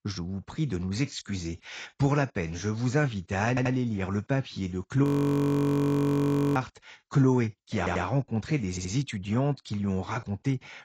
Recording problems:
garbled, watery; badly; nothing above 16 kHz
audio stuttering; at 3.5 s, at 8 s and at 8.5 s
audio freezing; at 5 s for 1.5 s

